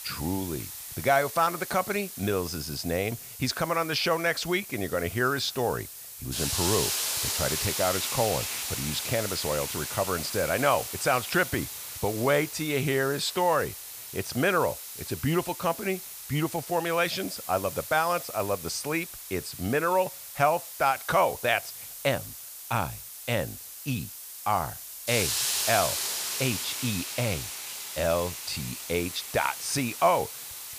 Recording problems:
hiss; loud; throughout; 5 dB below the speech

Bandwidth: 15 kHz